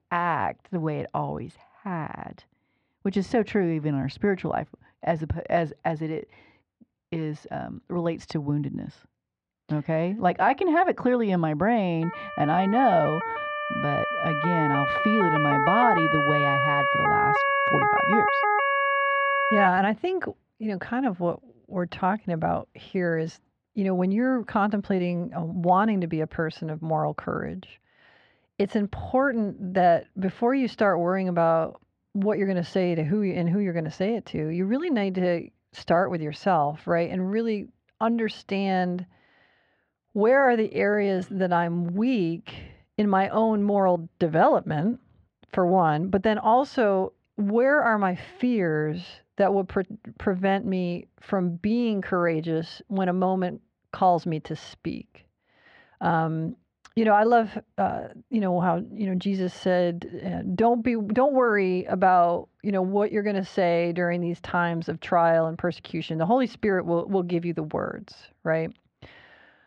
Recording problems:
muffled; very; fading above 2 kHz
siren; loud; from 12 to 20 s; peak 4 dB above the speech

